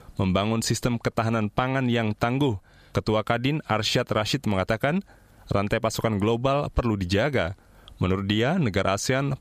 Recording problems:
squashed, flat; somewhat

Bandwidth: 14.5 kHz